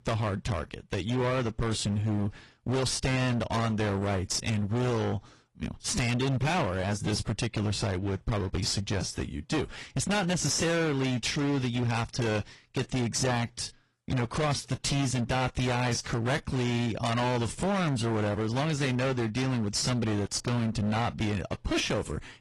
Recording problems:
distortion; heavy; 28% of the sound clipped
garbled, watery; slightly

